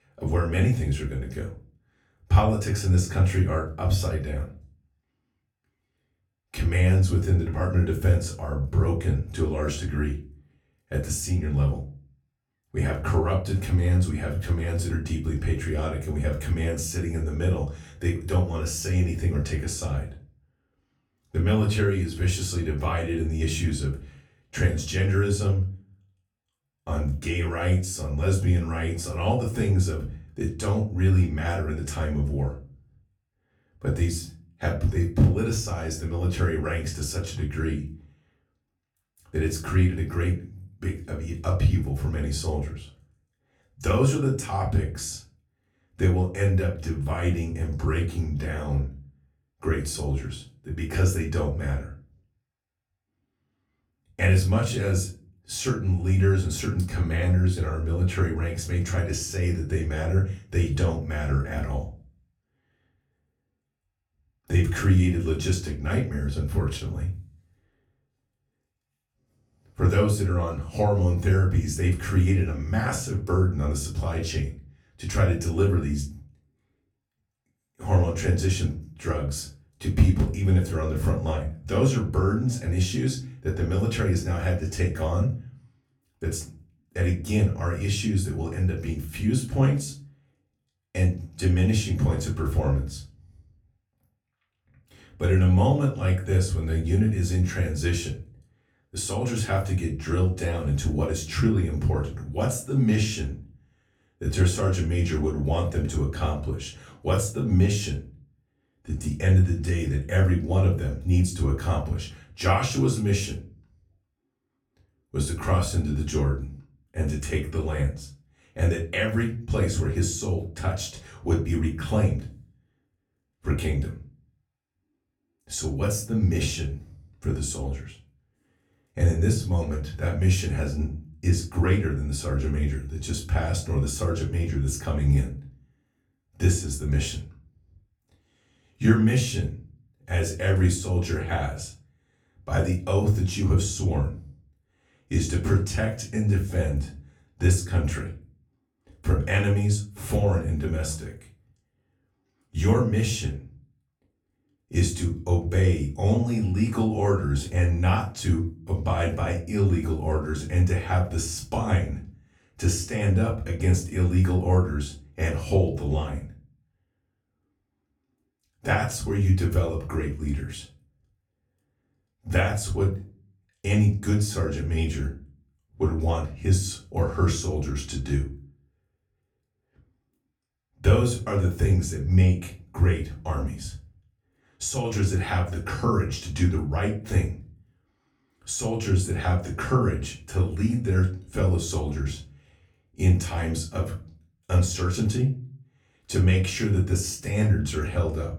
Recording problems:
off-mic speech; far
room echo; slight; dies away in 0.3 s

